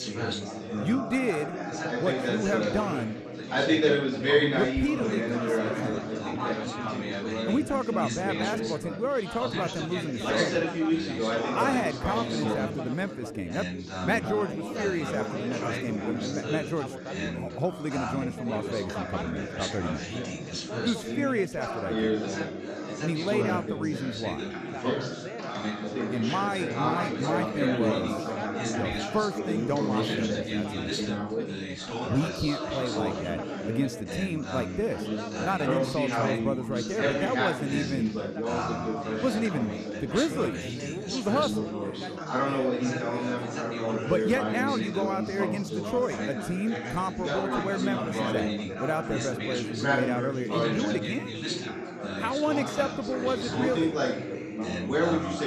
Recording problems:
chatter from many people; very loud; throughout; 1 dB above the speech

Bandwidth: 14.5 kHz